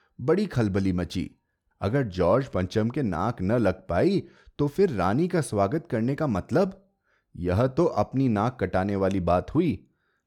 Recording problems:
none

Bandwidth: 18.5 kHz